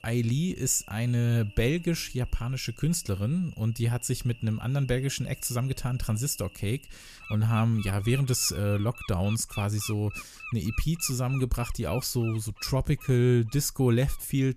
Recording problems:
animal sounds; noticeable; throughout; 15 dB below the speech

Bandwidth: 14.5 kHz